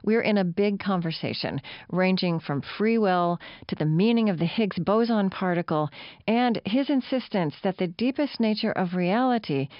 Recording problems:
high frequencies cut off; noticeable; nothing above 5.5 kHz

